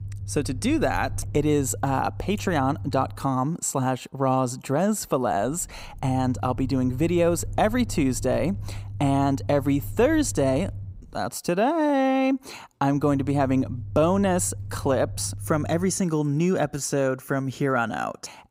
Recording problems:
low rumble; faint; until 3 s, from 5.5 to 11 s and from 13 to 16 s; 25 dB below the speech

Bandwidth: 15.5 kHz